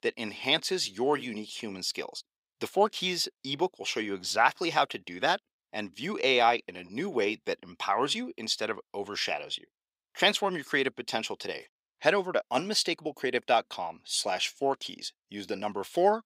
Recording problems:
thin; somewhat; fading below 400 Hz

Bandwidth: 15.5 kHz